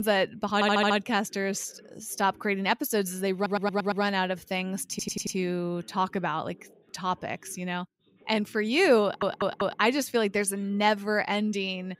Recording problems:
voice in the background; faint; throughout; 30 dB below the speech
abrupt cut into speech; at the start
audio stuttering; 4 times, first at 0.5 s

